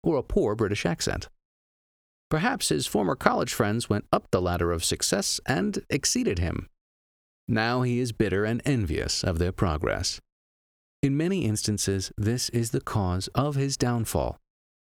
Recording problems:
squashed, flat; somewhat

